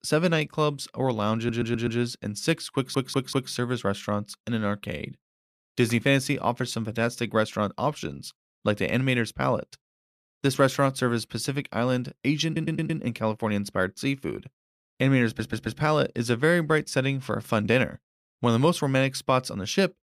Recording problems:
audio stuttering; 4 times, first at 1.5 s

